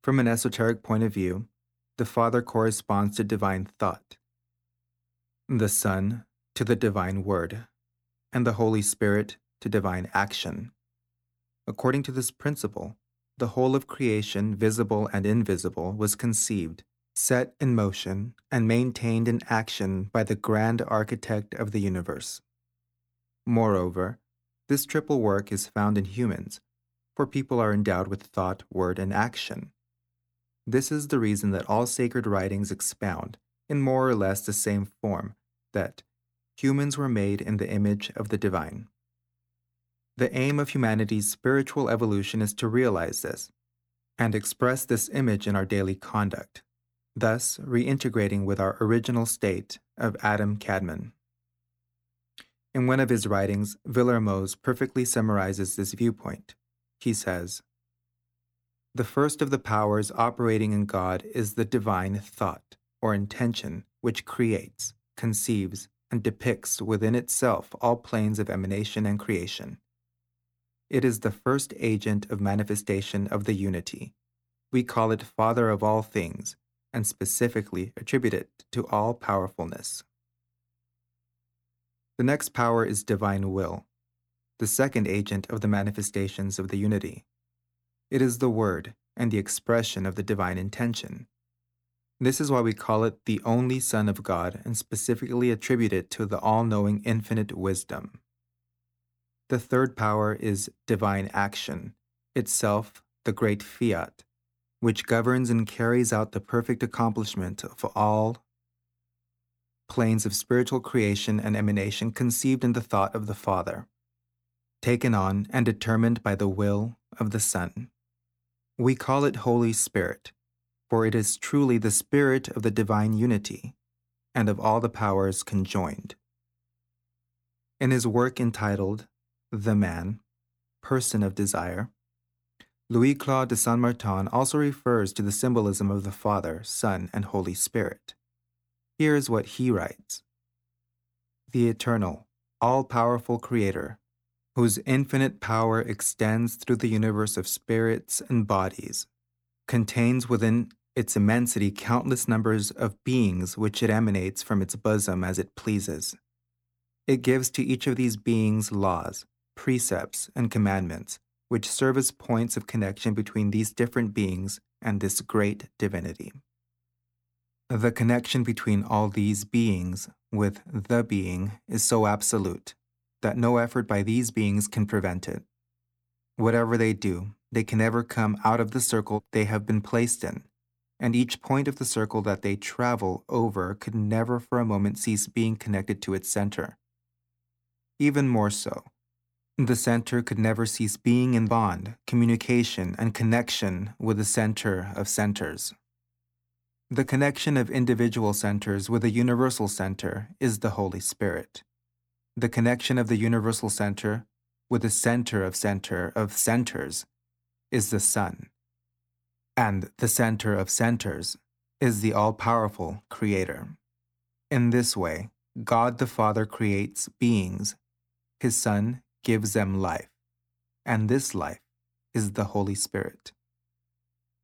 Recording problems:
none

